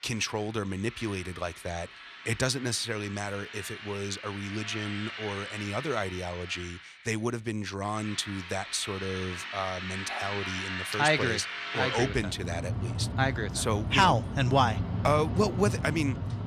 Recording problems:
machinery noise; loud; throughout; 5 dB below the speech

